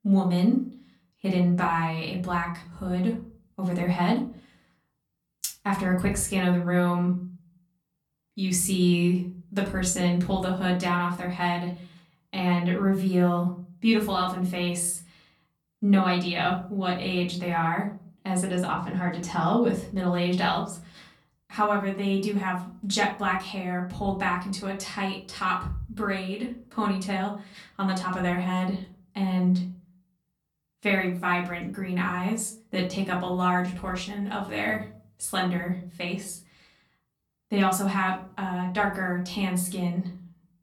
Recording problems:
off-mic speech; far
room echo; slight; dies away in 0.5 s

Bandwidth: 18.5 kHz